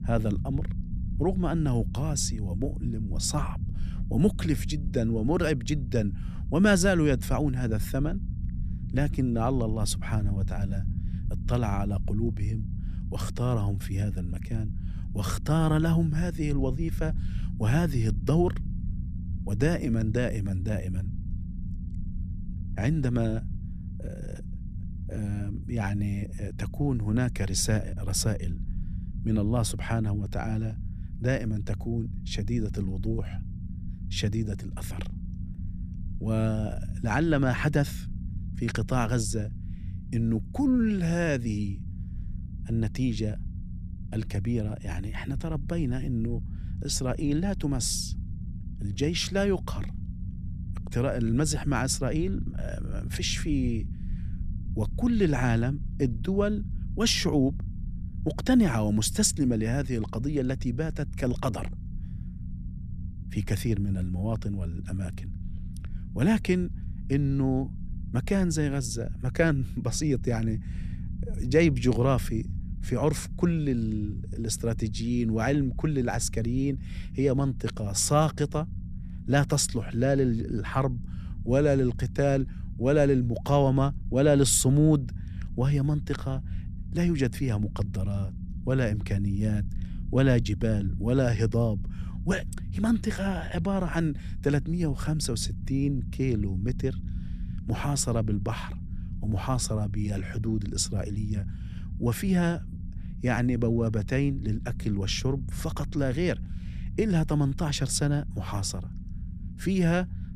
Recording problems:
low rumble; noticeable; throughout; 20 dB below the speech

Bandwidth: 14 kHz